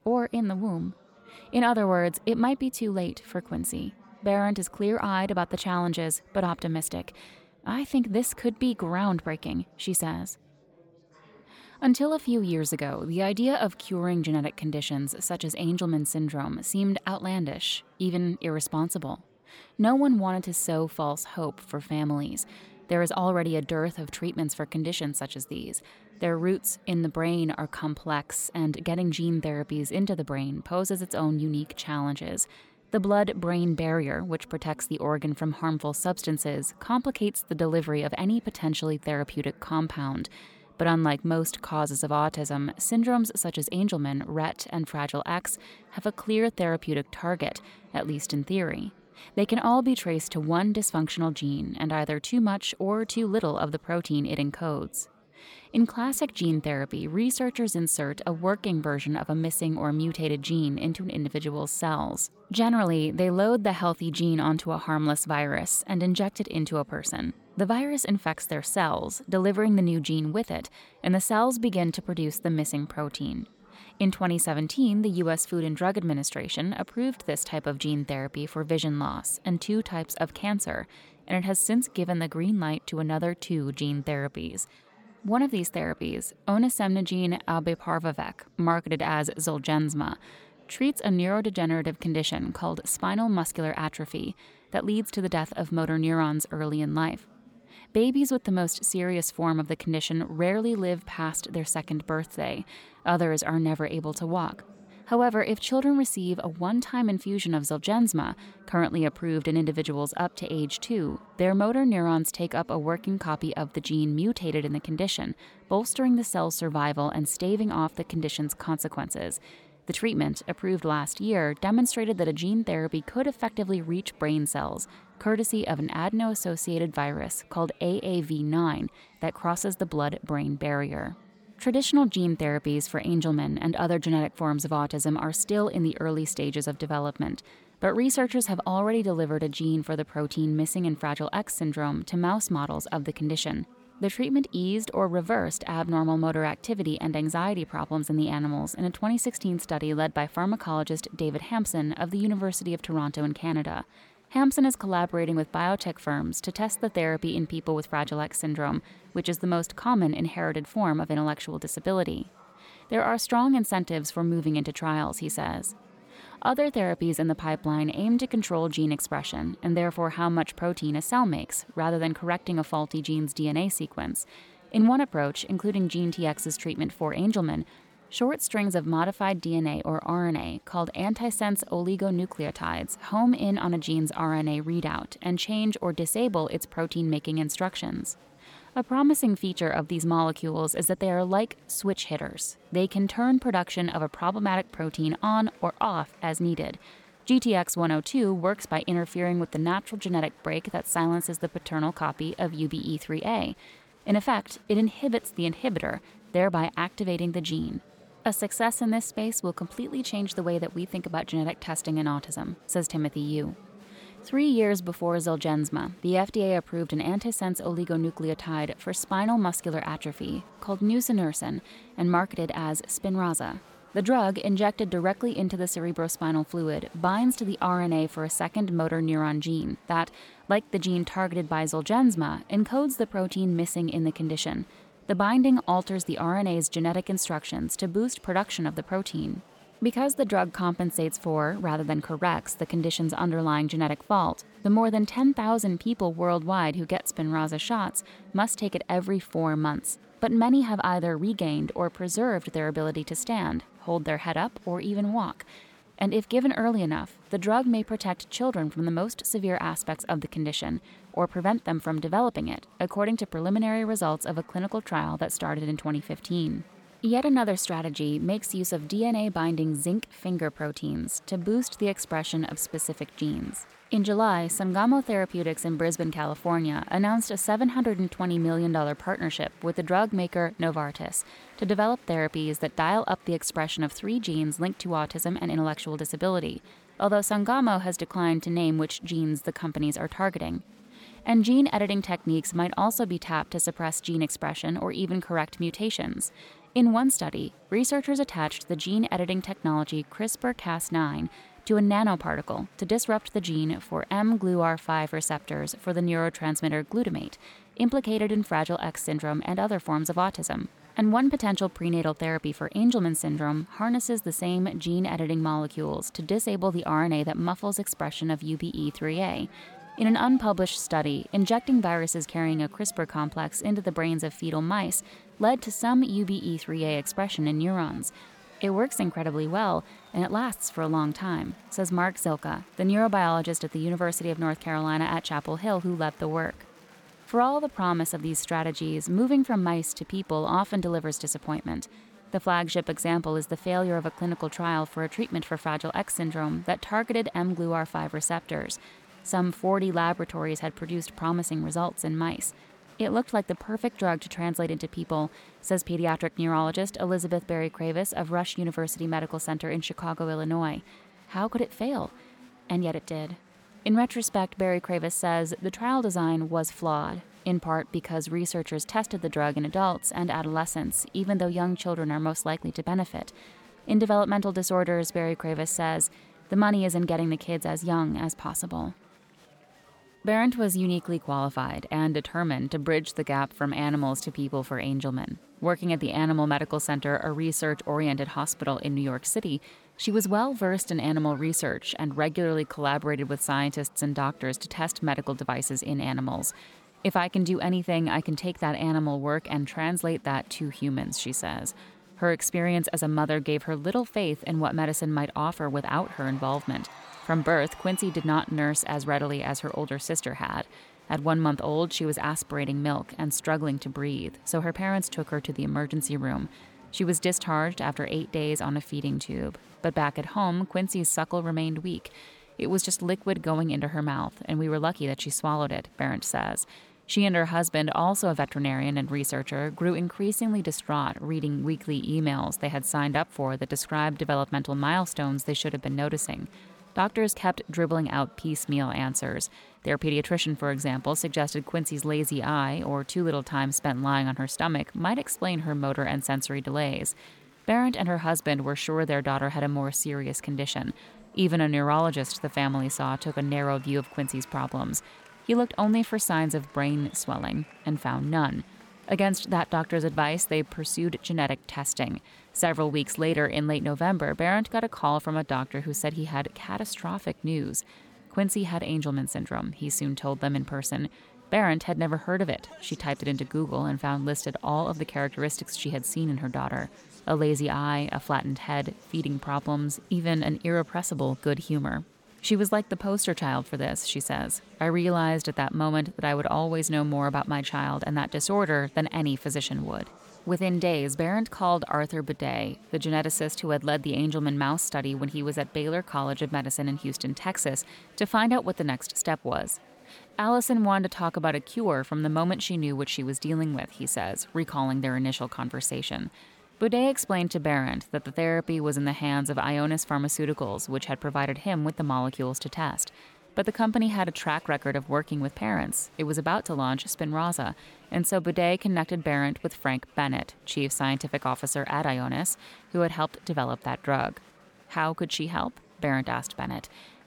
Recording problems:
murmuring crowd; faint; throughout; 25 dB below the speech

